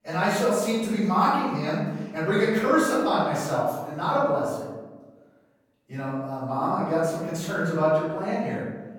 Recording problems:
room echo; strong; dies away in 1.2 s
off-mic speech; far

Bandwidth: 17.5 kHz